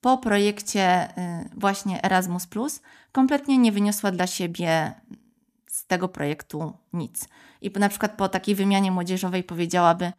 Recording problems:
none

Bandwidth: 14.5 kHz